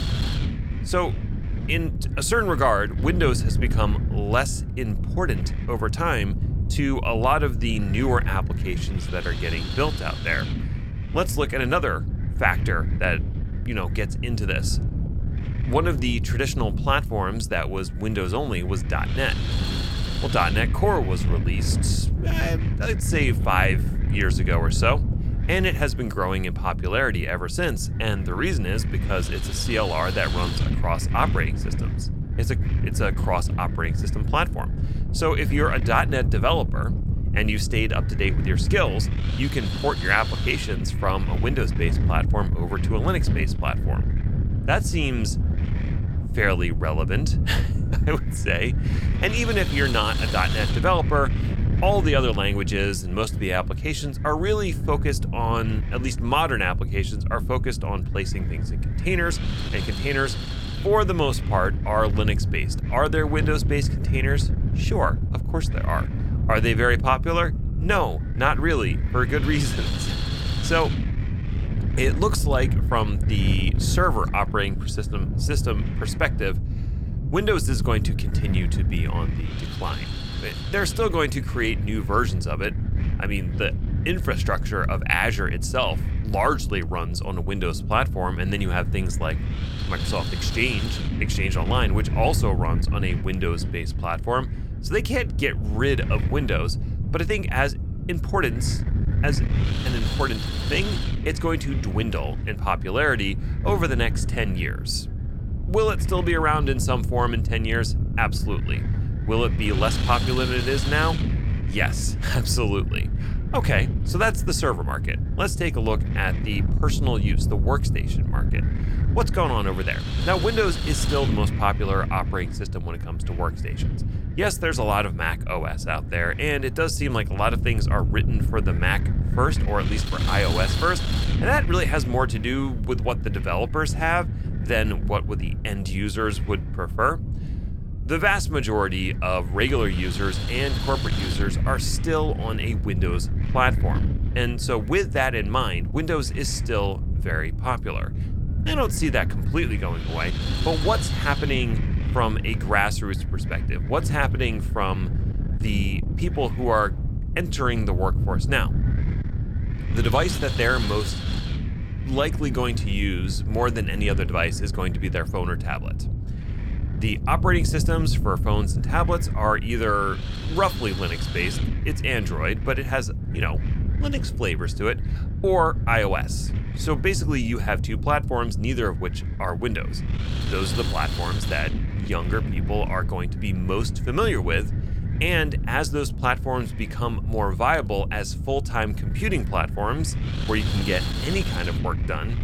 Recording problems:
wind noise on the microphone; occasional gusts; 10 dB below the speech

